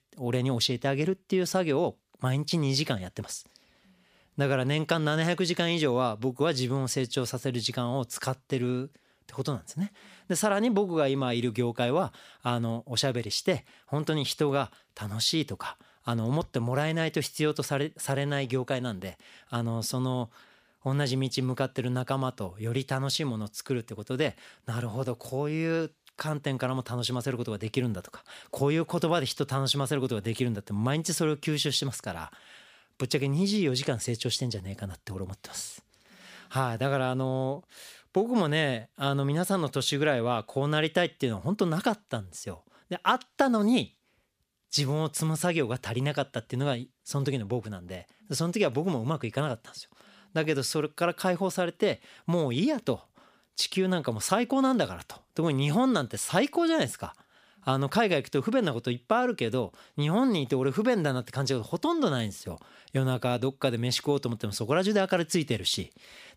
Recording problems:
none

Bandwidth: 15 kHz